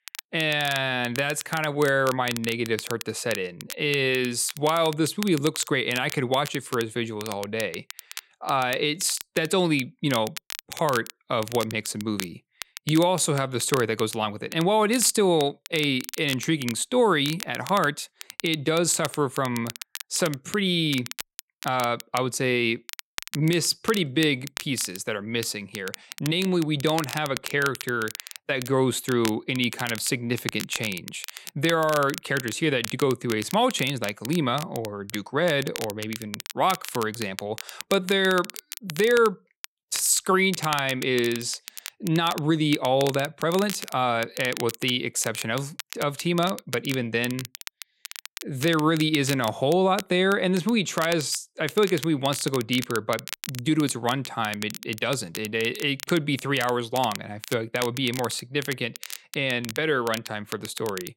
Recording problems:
crackle, like an old record; noticeable; 10 dB below the speech

